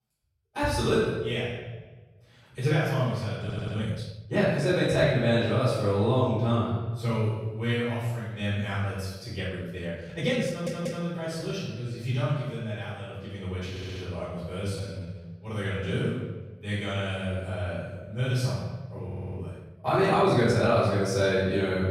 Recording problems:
room echo; strong; dies away in 1.1 s
off-mic speech; far
audio stuttering; 4 times, first at 3.5 s
uneven, jittery; strongly; from 3.5 to 21 s

